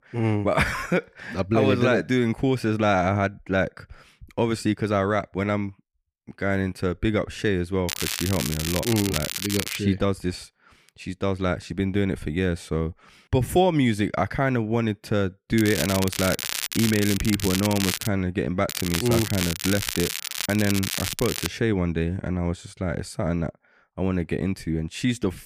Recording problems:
crackling; loud; from 8 to 10 s, from 16 to 18 s and from 19 to 21 s; 4 dB below the speech

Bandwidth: 15 kHz